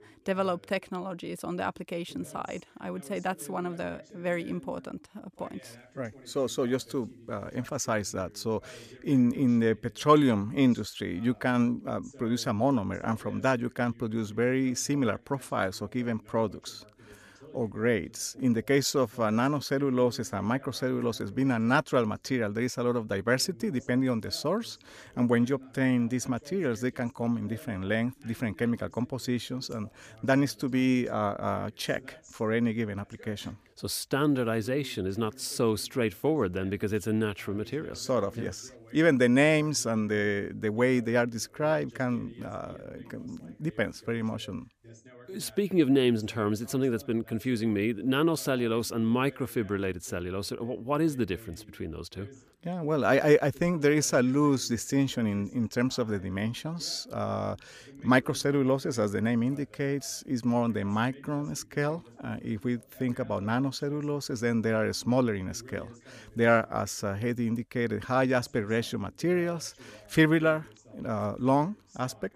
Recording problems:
voice in the background; faint; throughout; 25 dB below the speech

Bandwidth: 15 kHz